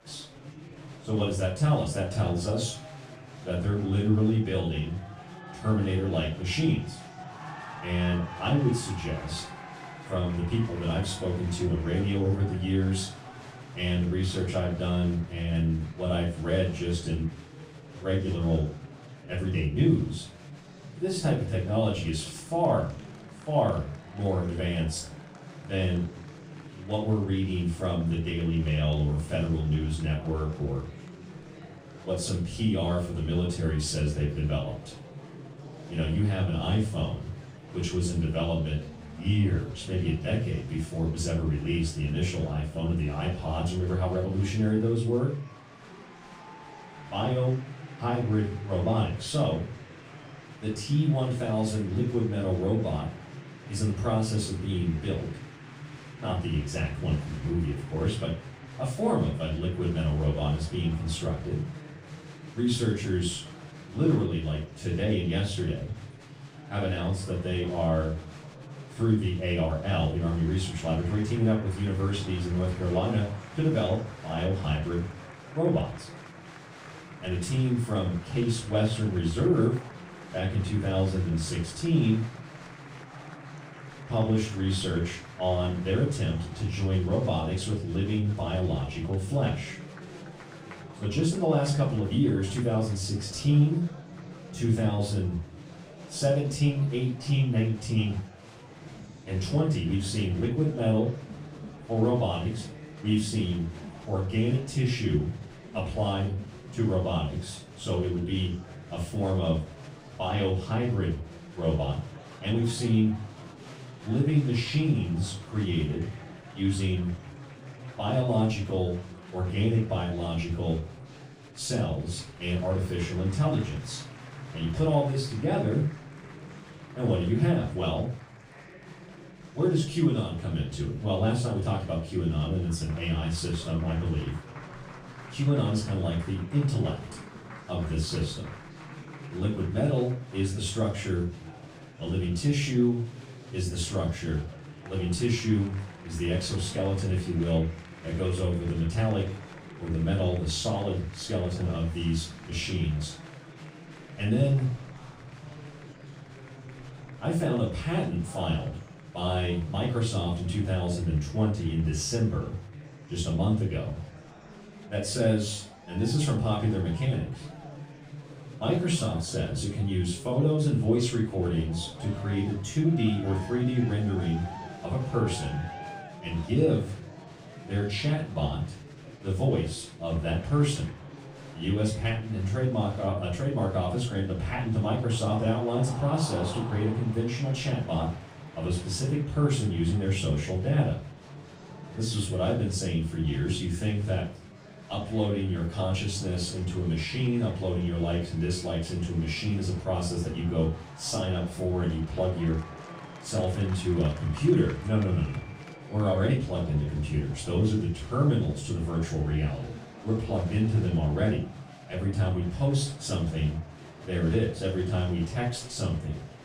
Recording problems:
off-mic speech; far
room echo; noticeable; dies away in 0.3 s
murmuring crowd; noticeable; throughout; 15 dB below the speech

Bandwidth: 15.5 kHz